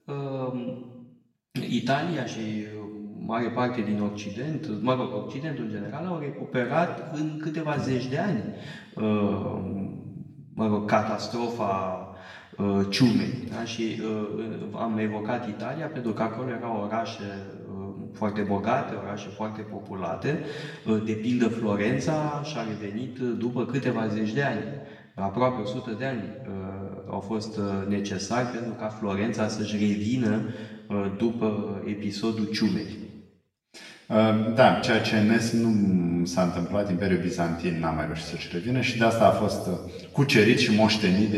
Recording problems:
off-mic speech; far
room echo; noticeable; dies away in 1.1 s
abrupt cut into speech; at the end

